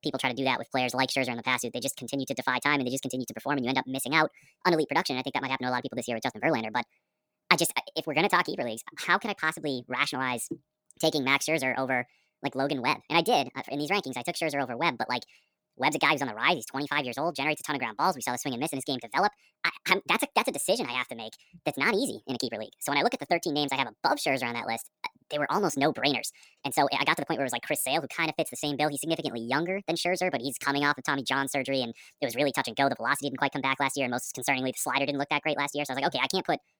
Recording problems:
wrong speed and pitch; too fast and too high; 1.5 times normal speed

